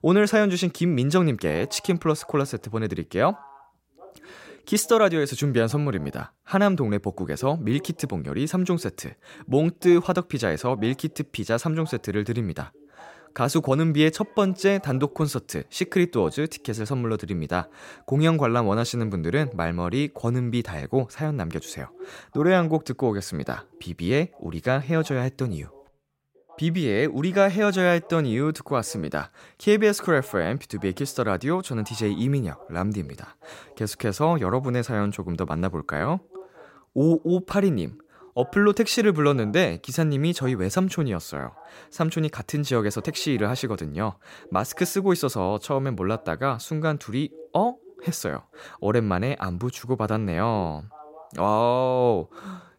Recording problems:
voice in the background; faint; throughout; 25 dB below the speech

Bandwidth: 16 kHz